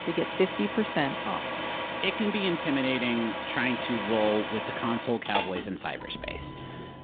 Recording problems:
phone-call audio; nothing above 3.5 kHz
traffic noise; loud; throughout; 4 dB below the speech

